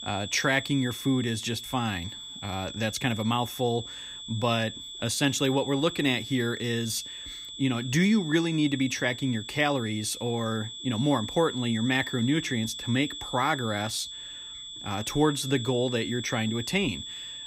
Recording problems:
high-pitched whine; loud; throughout; 3.5 kHz, 9 dB below the speech

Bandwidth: 15.5 kHz